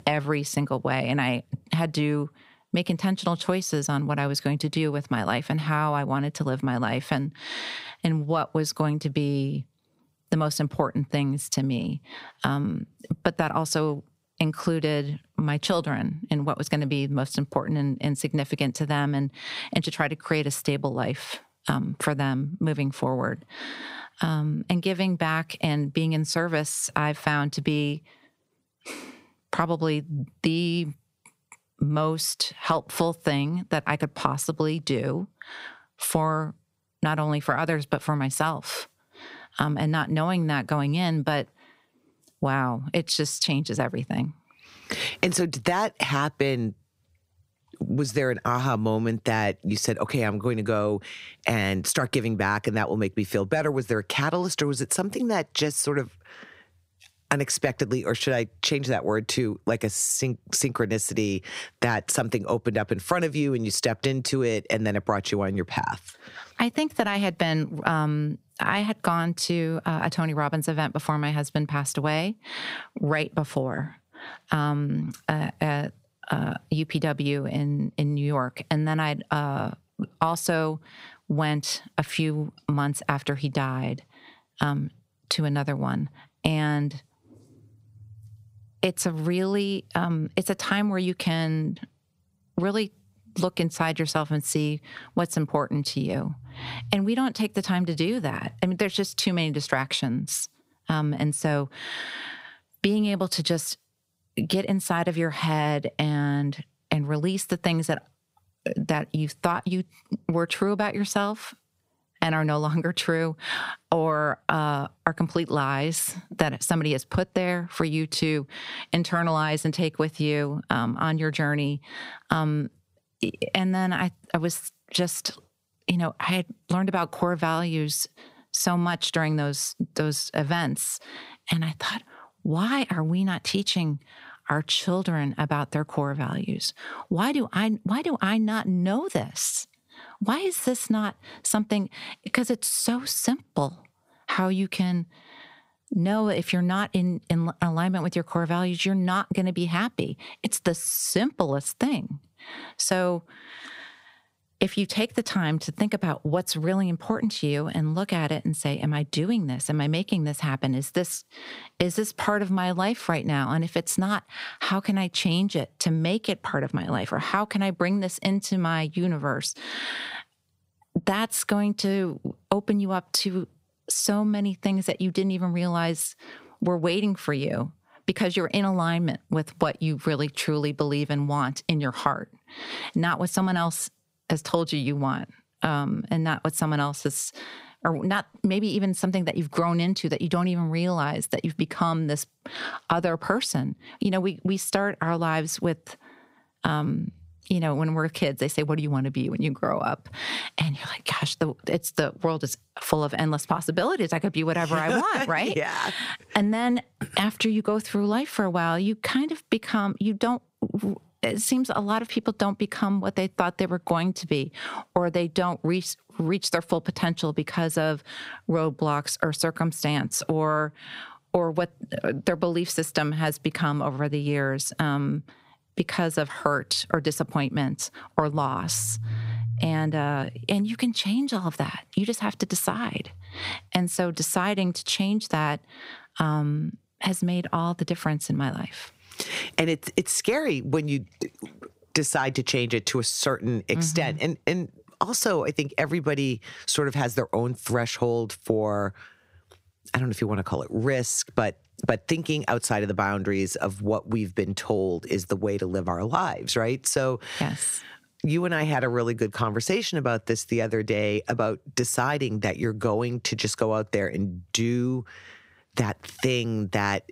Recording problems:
squashed, flat; somewhat

